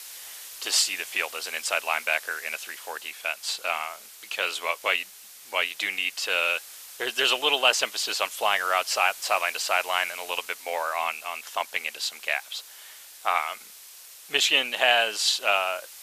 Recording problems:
thin; very; fading below 750 Hz
hiss; noticeable; throughout; 15 dB below the speech

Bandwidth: 14.5 kHz